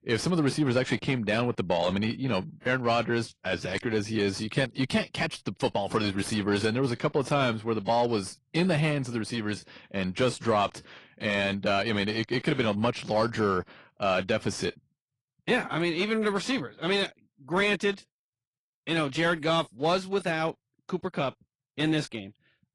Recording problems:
distortion; slight; 10 dB below the speech
garbled, watery; slightly; nothing above 10.5 kHz

